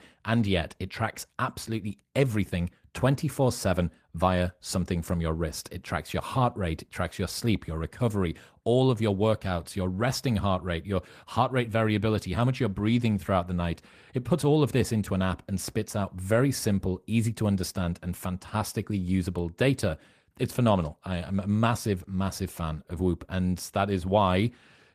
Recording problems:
garbled, watery; slightly; nothing above 14.5 kHz

